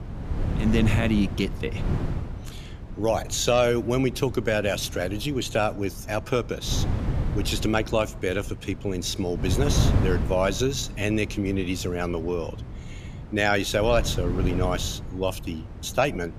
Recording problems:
wind noise on the microphone; occasional gusts; 15 dB below the speech

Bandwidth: 14.5 kHz